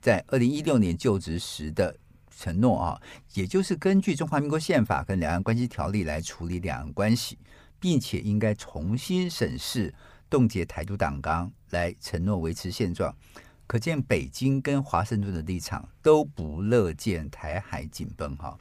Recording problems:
none

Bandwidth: 15 kHz